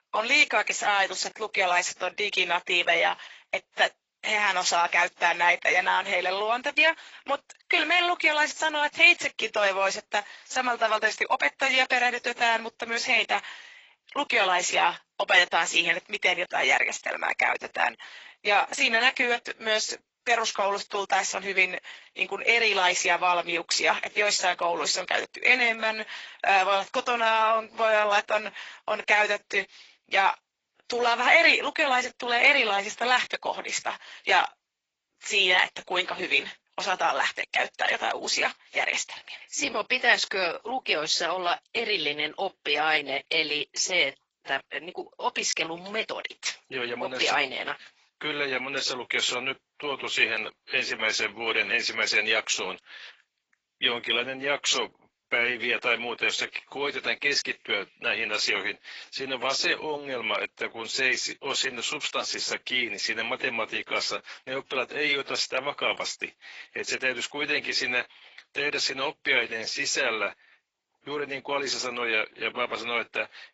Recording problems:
garbled, watery; badly; nothing above 7.5 kHz
thin; very; fading below 750 Hz

